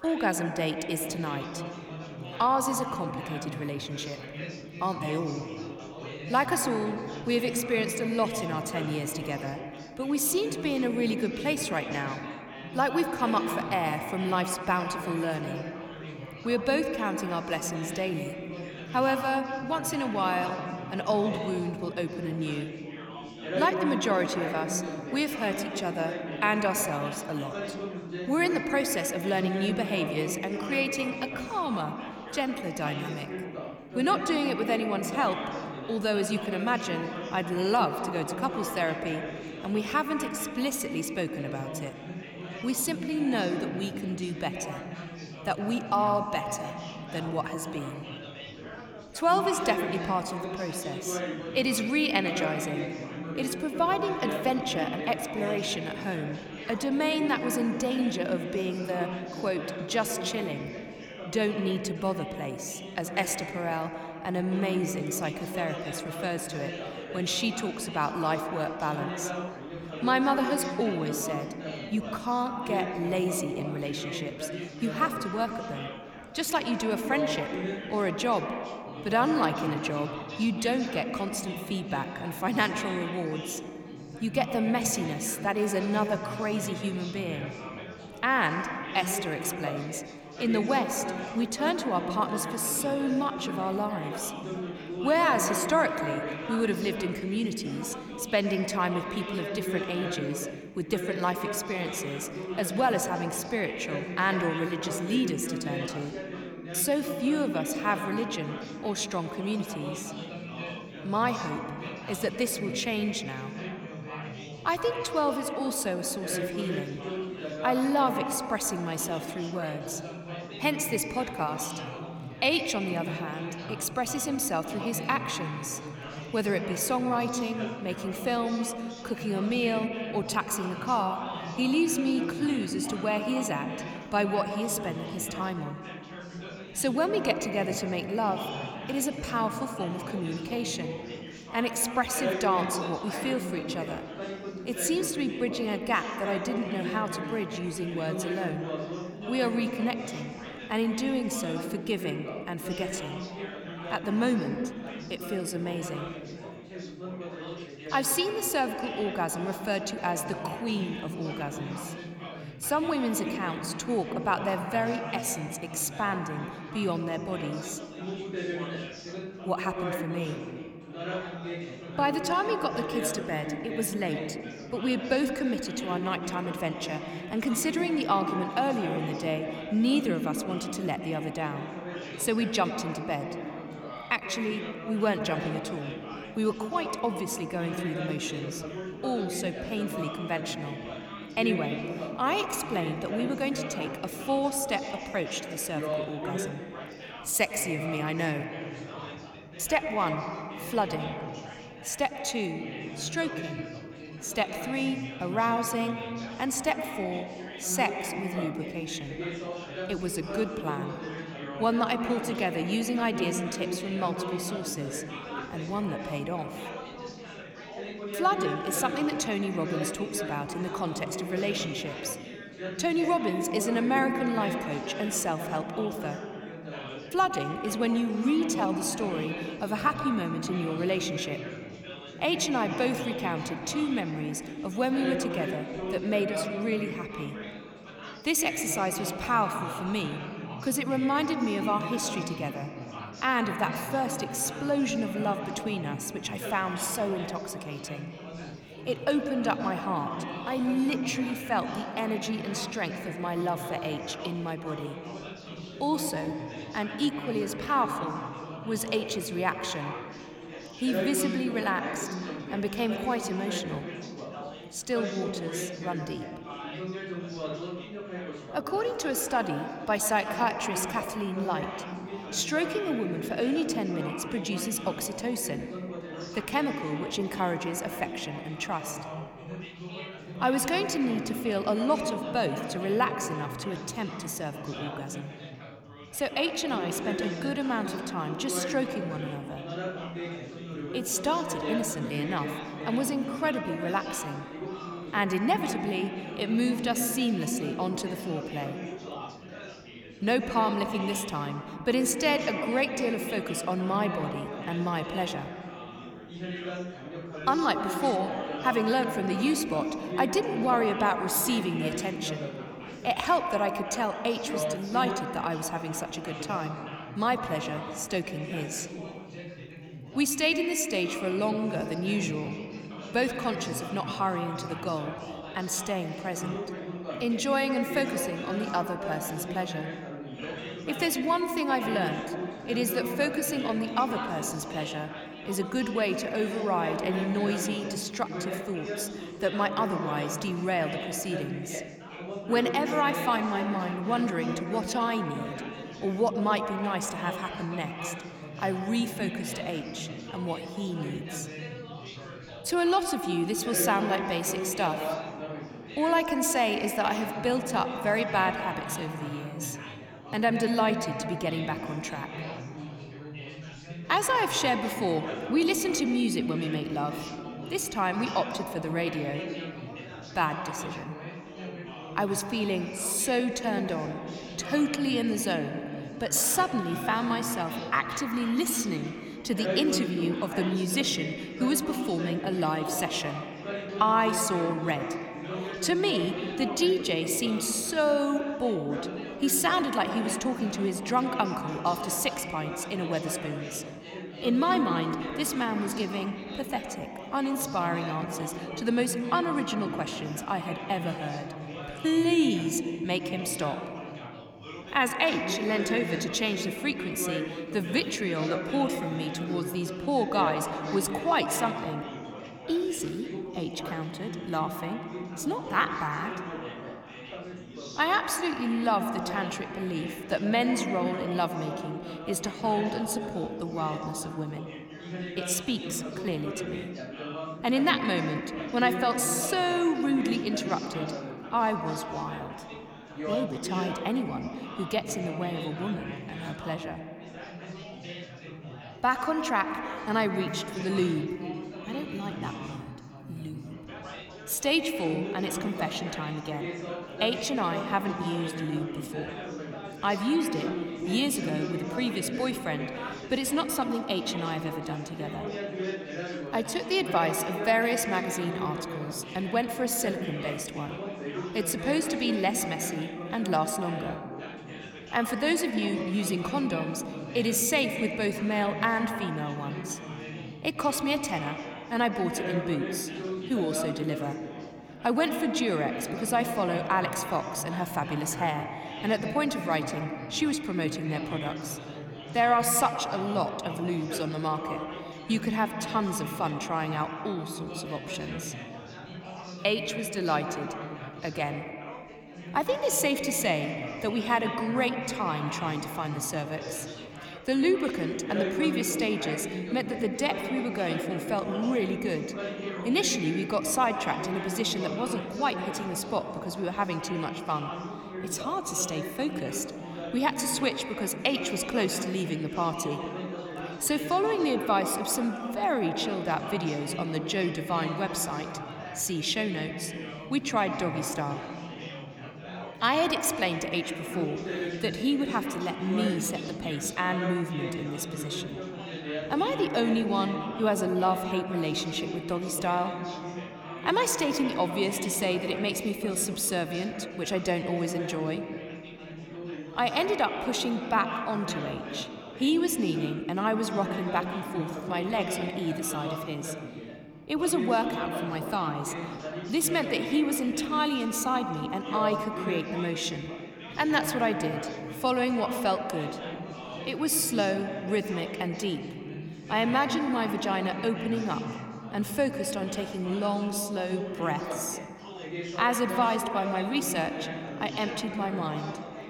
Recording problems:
echo of what is said; strong; throughout; 100 ms later, 7 dB below the speech
background chatter; loud; throughout; 4 voices, 9 dB below the speech

